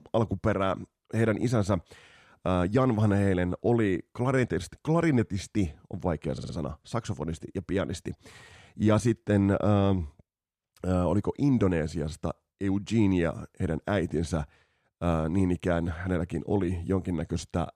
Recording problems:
audio stuttering; at 6.5 s

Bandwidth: 14.5 kHz